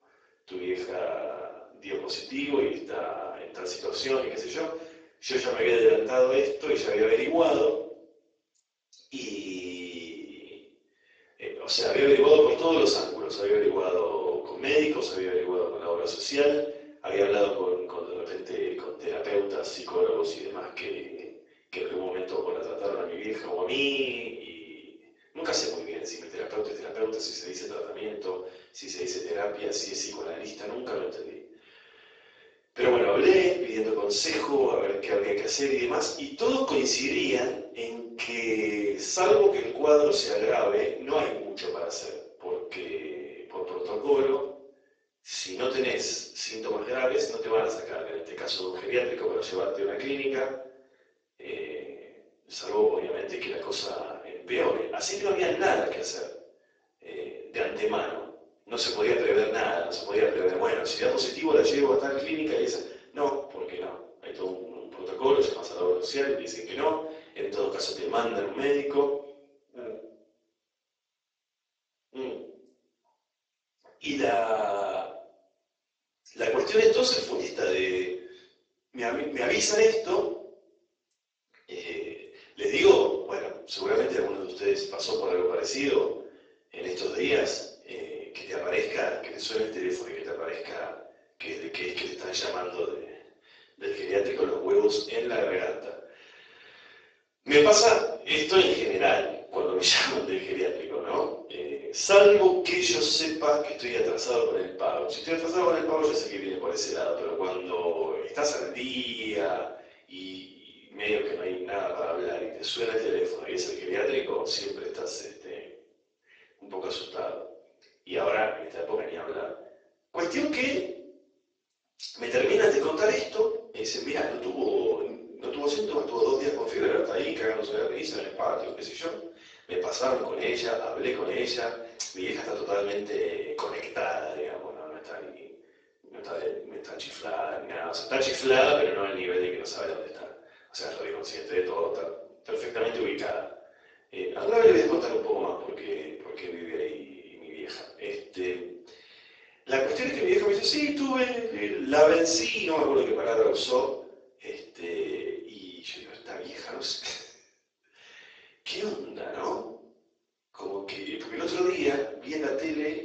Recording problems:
off-mic speech; far
garbled, watery; badly
thin; very; fading below 350 Hz
room echo; noticeable; dies away in 0.6 s

